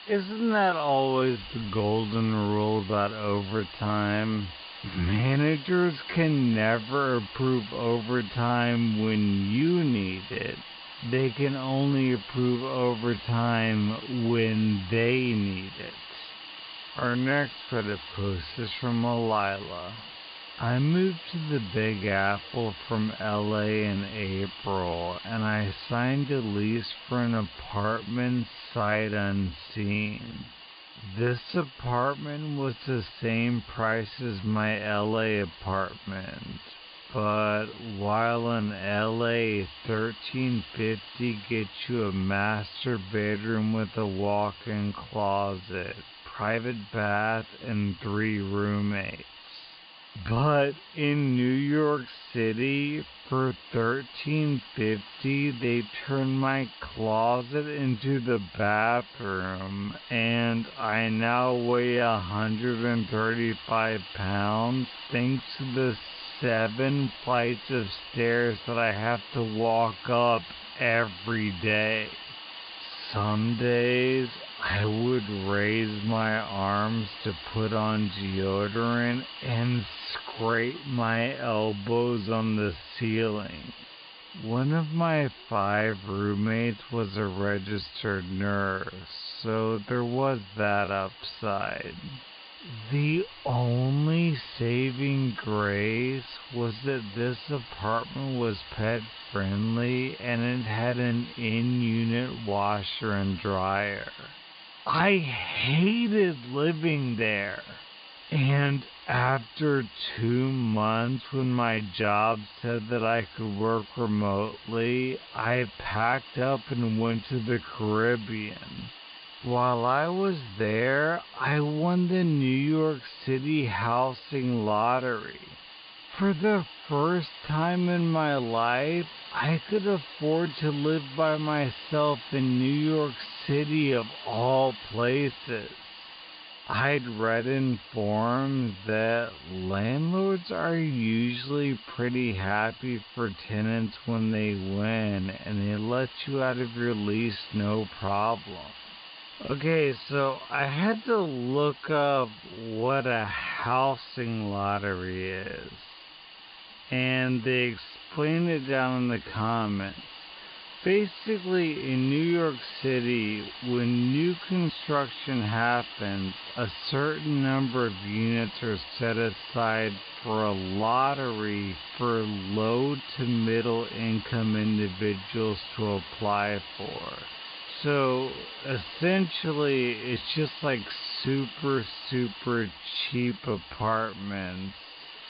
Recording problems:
high frequencies cut off; severe; nothing above 5 kHz
wrong speed, natural pitch; too slow; 0.5 times normal speed
hiss; noticeable; throughout; 15 dB below the speech
uneven, jittery; strongly; from 17 s to 3:02

